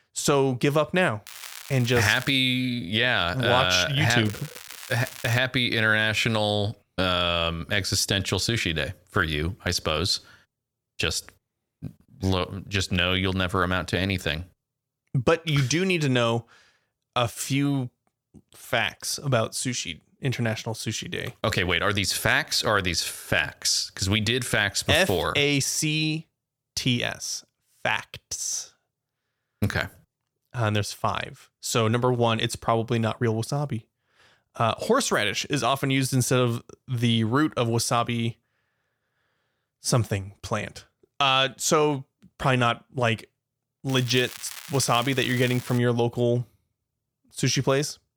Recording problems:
crackling; noticeable; from 1.5 to 2.5 s, from 4.5 to 5.5 s and from 44 to 46 s; 15 dB below the speech

